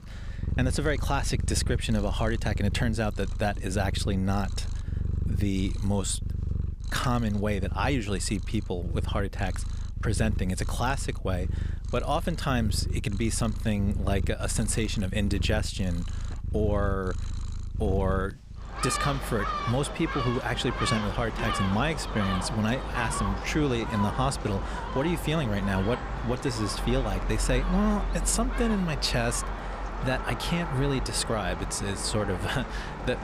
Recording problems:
animal sounds; loud; throughout; 4 dB below the speech

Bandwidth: 15 kHz